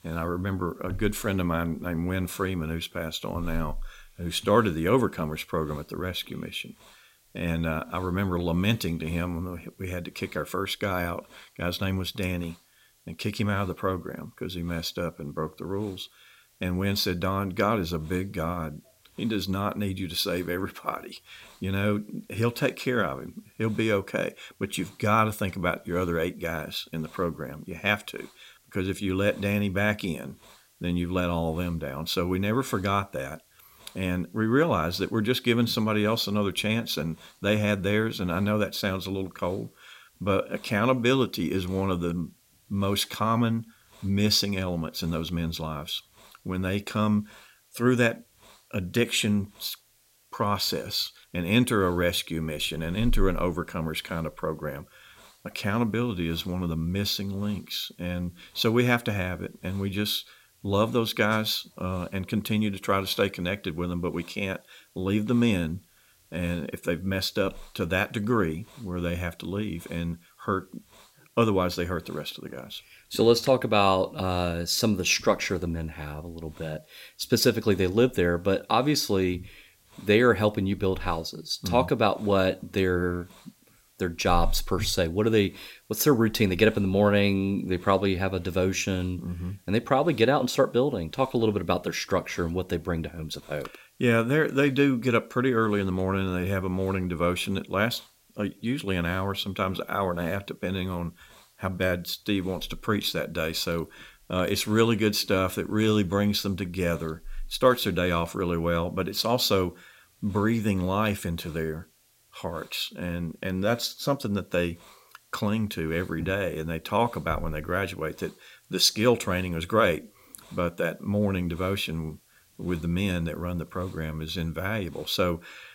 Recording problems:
hiss; faint; throughout; 30 dB below the speech

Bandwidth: 16 kHz